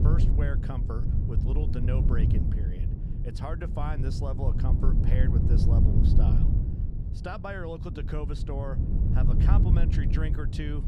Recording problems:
wind noise on the microphone; heavy; 1 dB below the speech

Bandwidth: 15 kHz